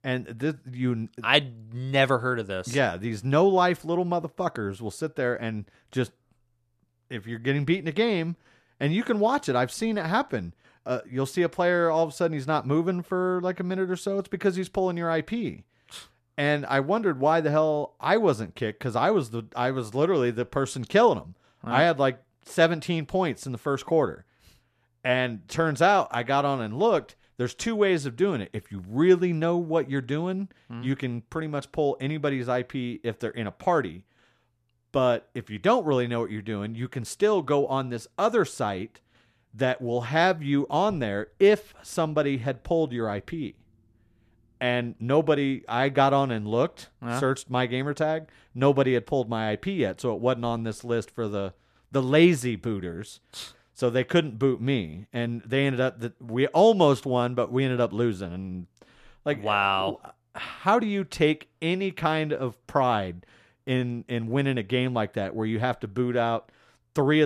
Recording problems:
abrupt cut into speech; at the end

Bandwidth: 14 kHz